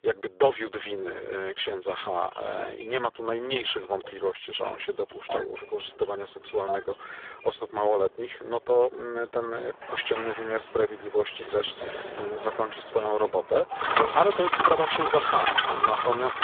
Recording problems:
phone-call audio; poor line; nothing above 3.5 kHz
traffic noise; very loud; throughout; 2 dB above the speech
dog barking; noticeable; from 9.5 to 14 s; peak 8 dB below the speech

